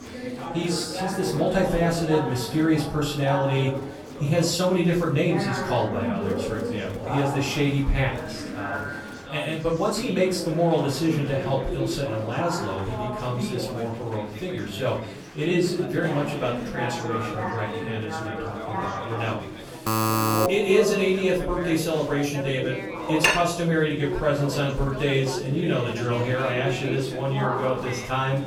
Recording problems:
off-mic speech; far
room echo; slight; dies away in 0.4 s
chatter from many people; loud; throughout; 7 dB below the speech
alarm; loud; at 20 s; peak 4 dB above the speech
clattering dishes; loud; at 23 s; peak 4 dB above the speech

